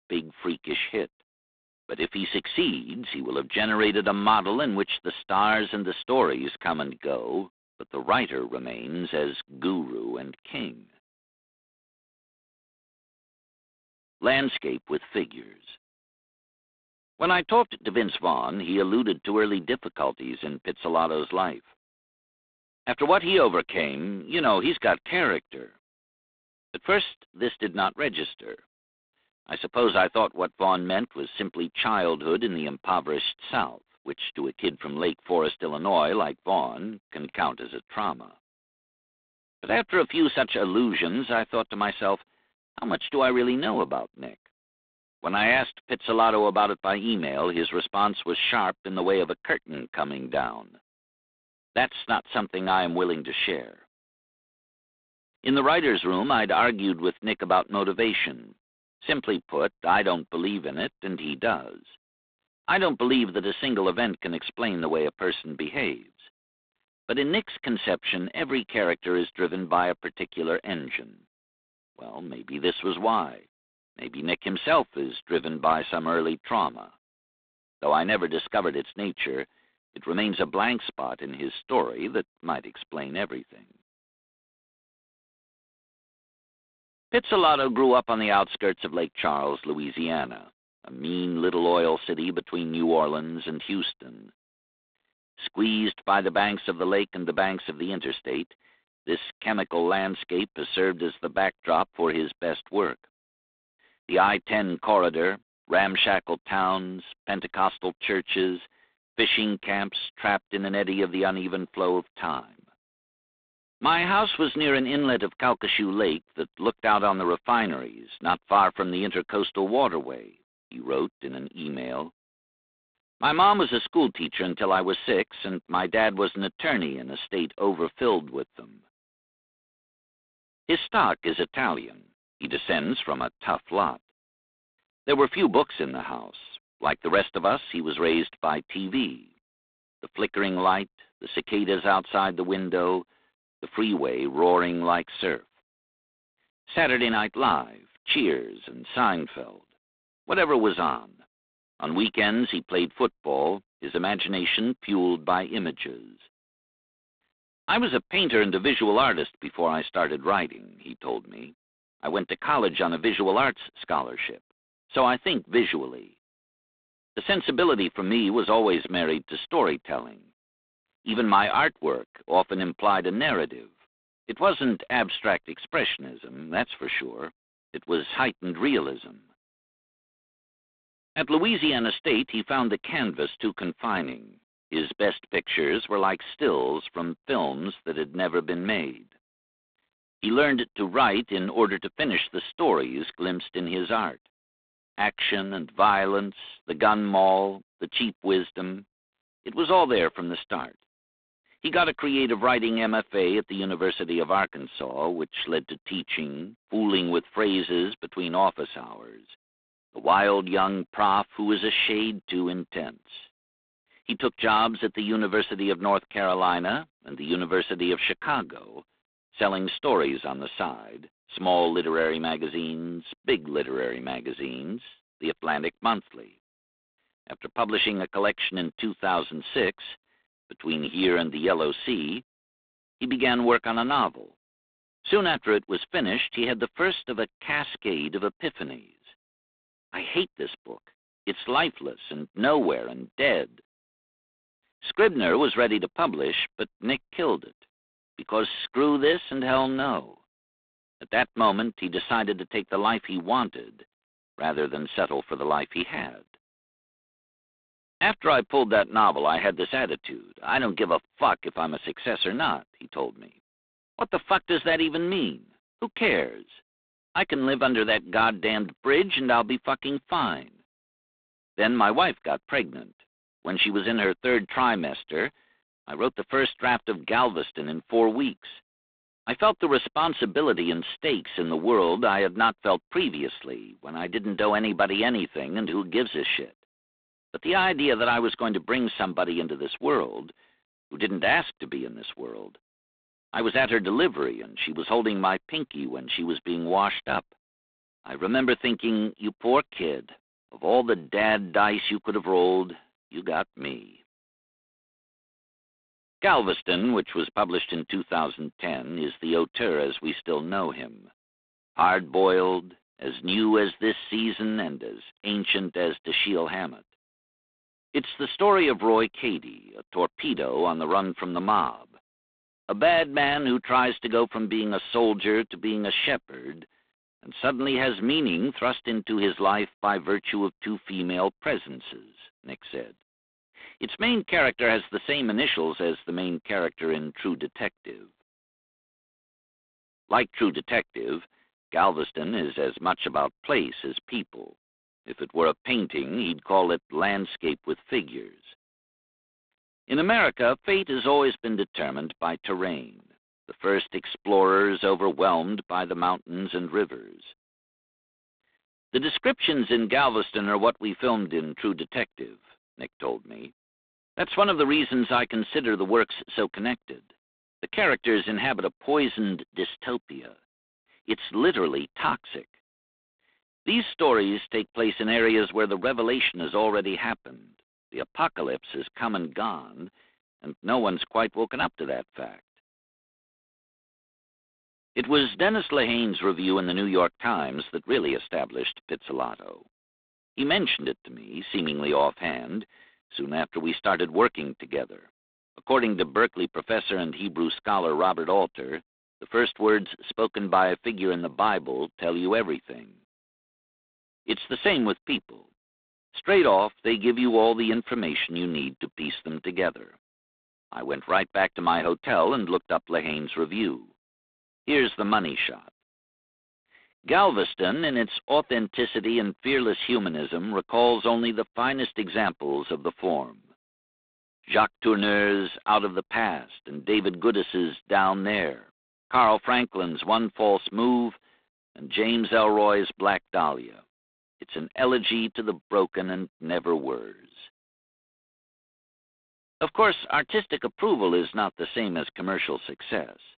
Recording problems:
phone-call audio; poor line; nothing above 3.5 kHz

